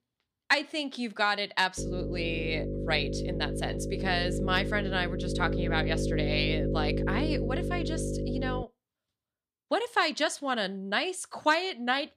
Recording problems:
electrical hum; loud; from 2 to 8.5 s; 50 Hz, 7 dB below the speech

